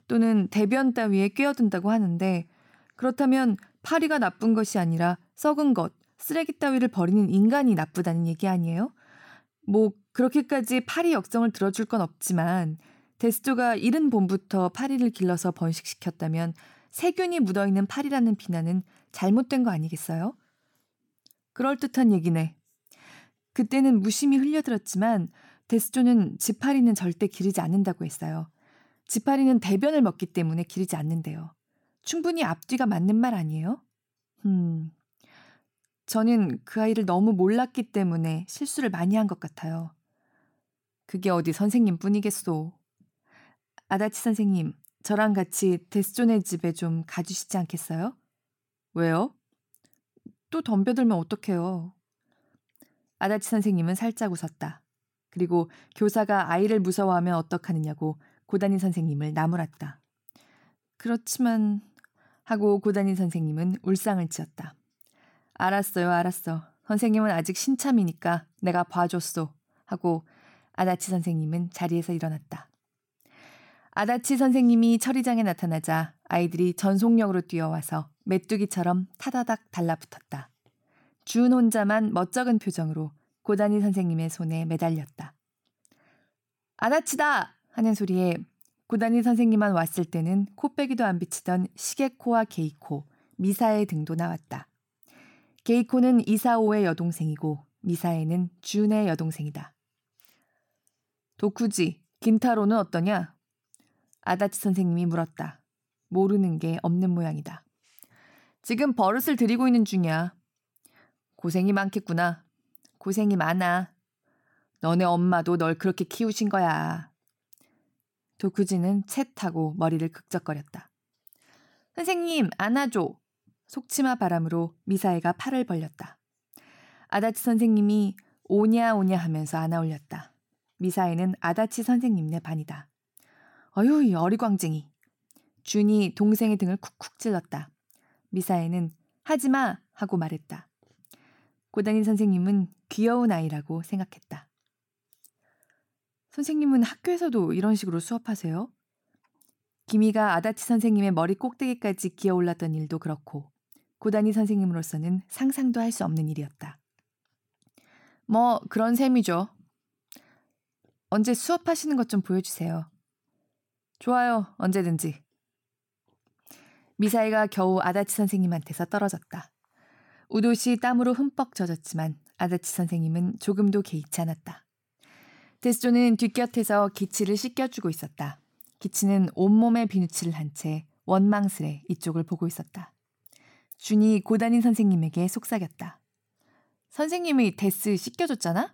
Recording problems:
none

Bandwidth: 18 kHz